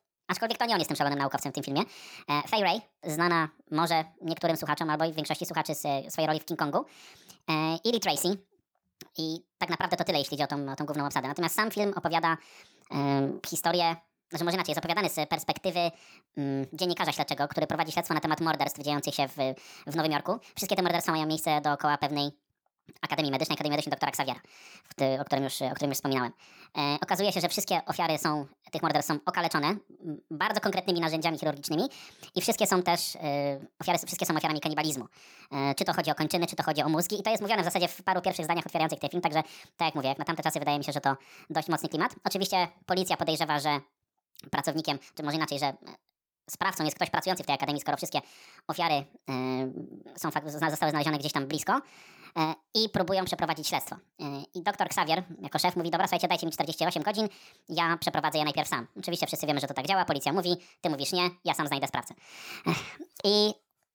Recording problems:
wrong speed and pitch; too fast and too high; 1.5 times normal speed

